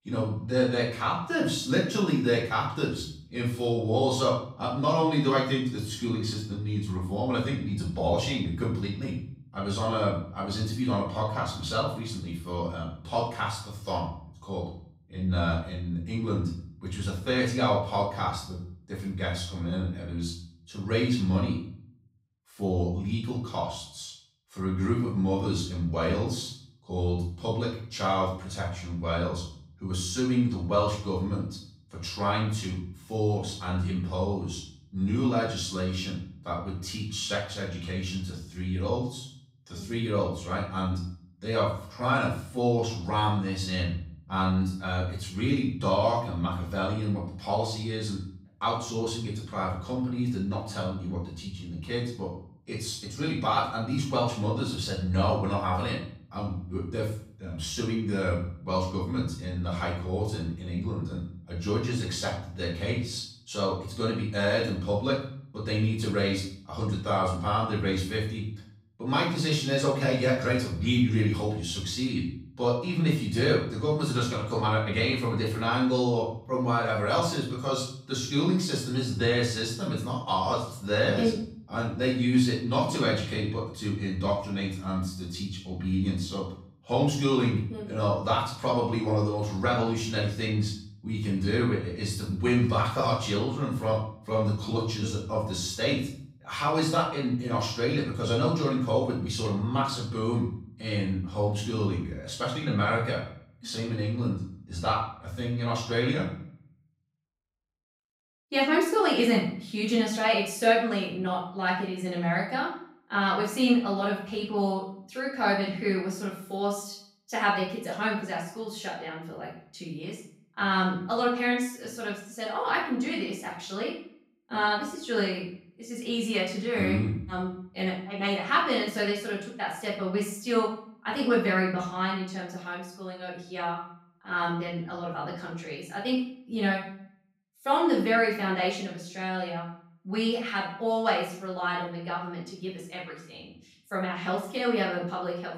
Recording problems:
off-mic speech; far
room echo; noticeable; dies away in 0.5 s
echo of what is said; faint; from 1:41 on; 90 ms later, 20 dB below the speech

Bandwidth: 15.5 kHz